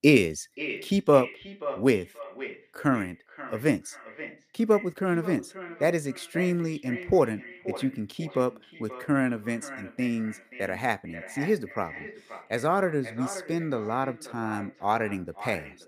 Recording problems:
echo of what is said; noticeable; throughout; 530 ms later, 15 dB below the speech

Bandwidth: 15 kHz